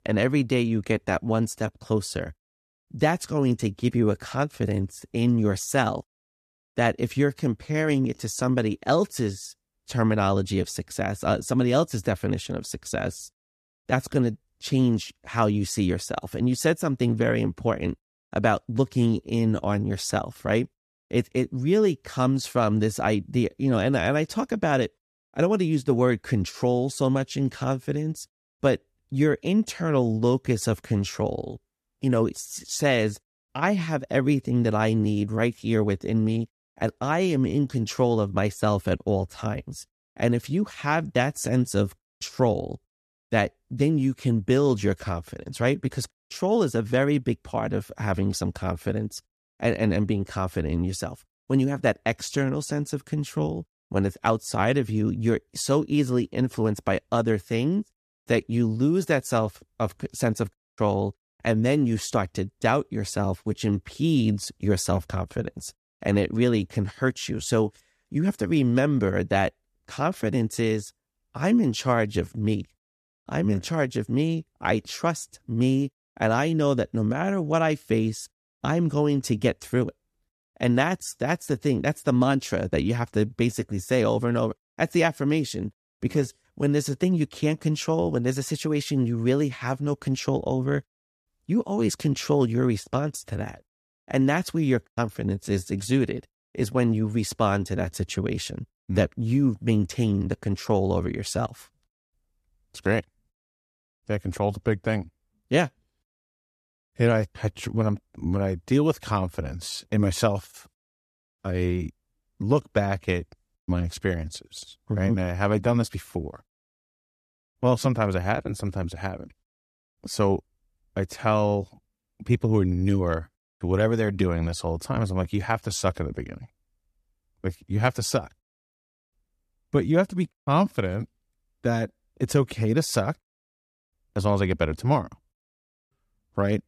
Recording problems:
none

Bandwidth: 14.5 kHz